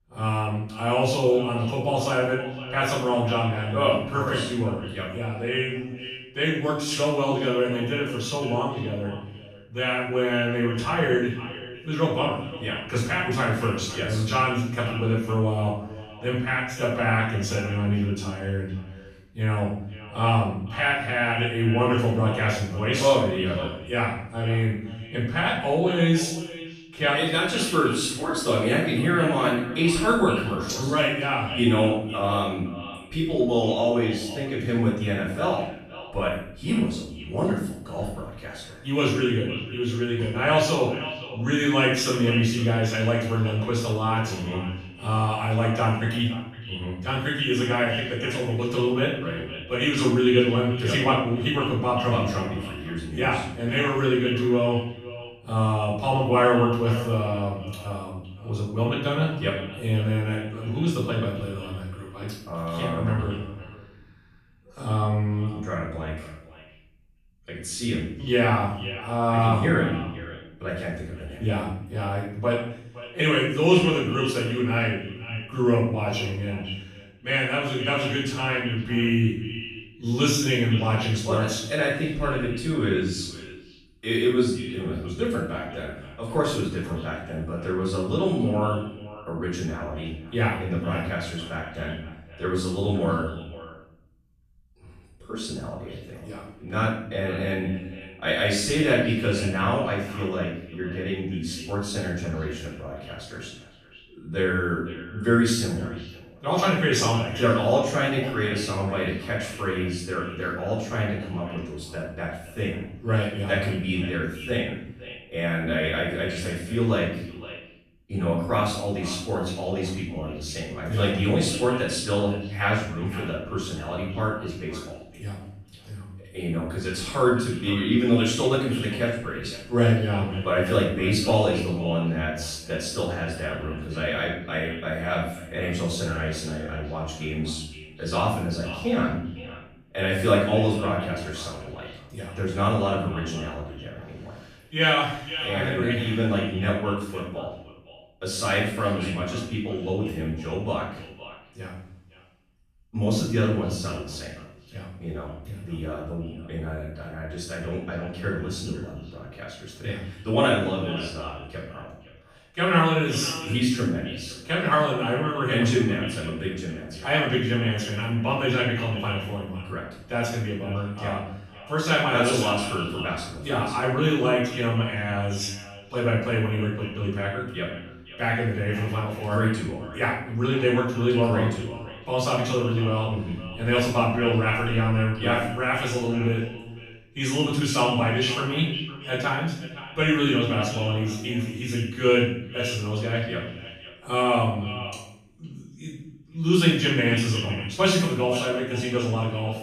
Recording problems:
off-mic speech; far
echo of what is said; noticeable; throughout; 510 ms later, 15 dB below the speech
room echo; noticeable; dies away in 0.7 s

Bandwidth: 14.5 kHz